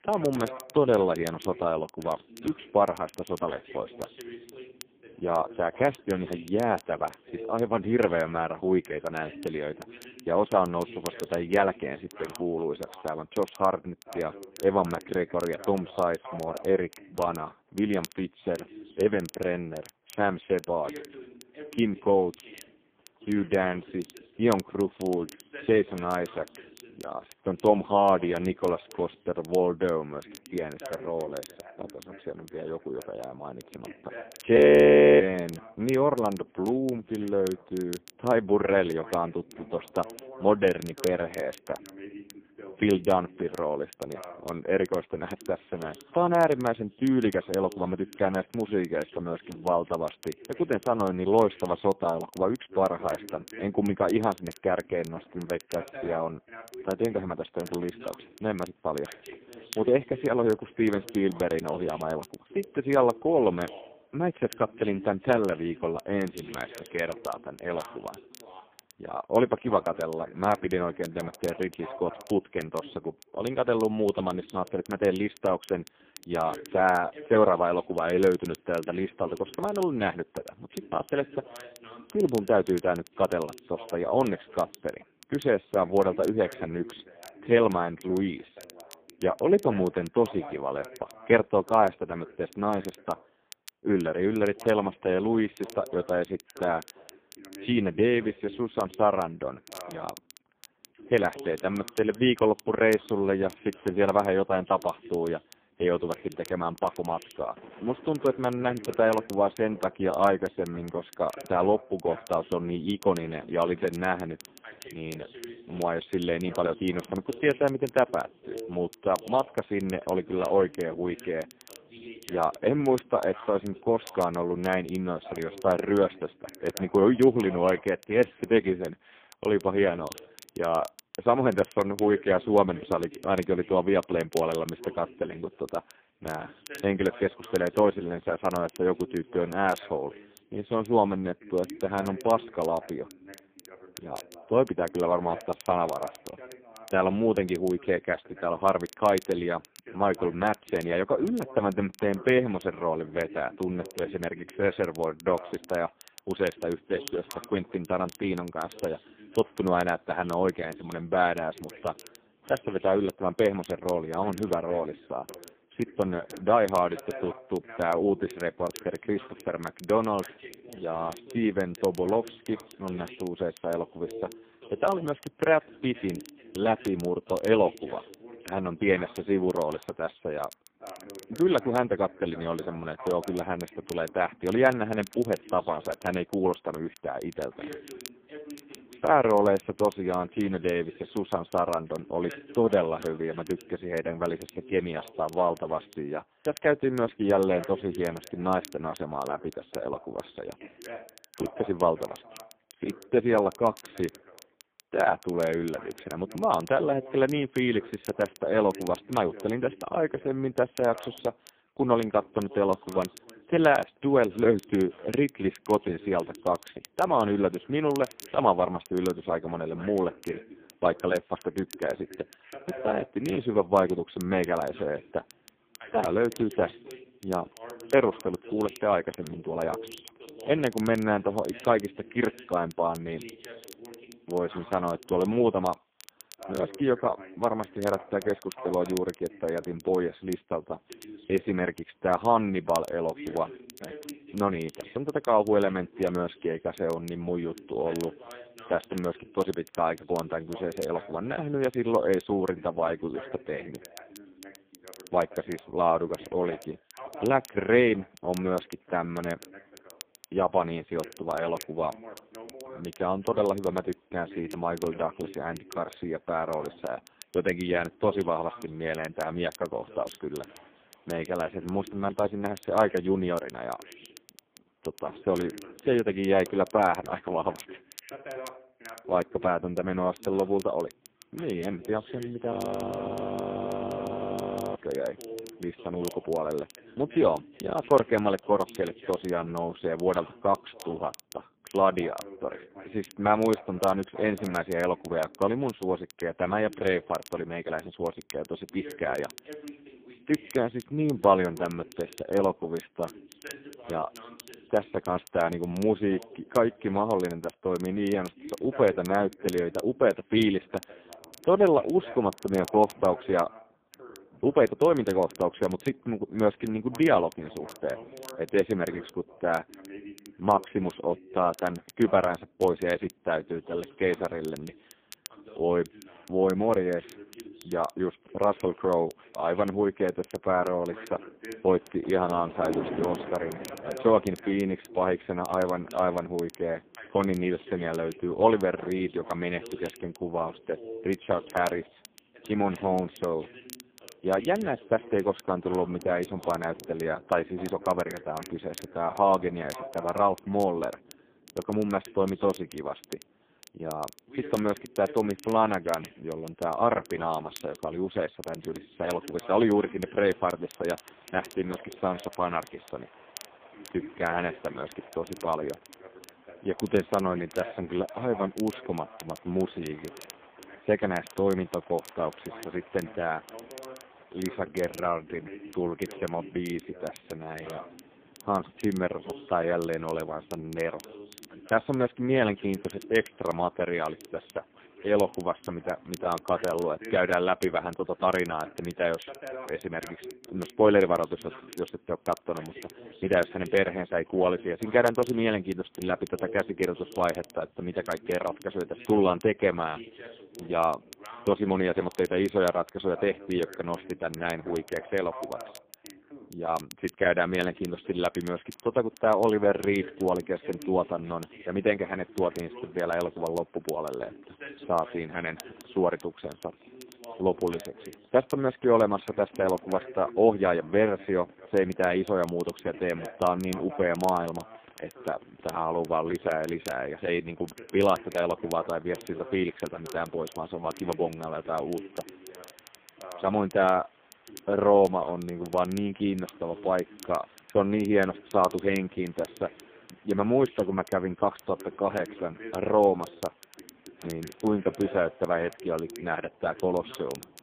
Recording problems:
phone-call audio; poor line
voice in the background; noticeable; throughout; 20 dB below the speech
rain or running water; faint; throughout; 25 dB below the speech
crackle, like an old record; faint; 25 dB below the speech
audio freezing; at 35 s for 0.5 s and at 4:43 for 2 s

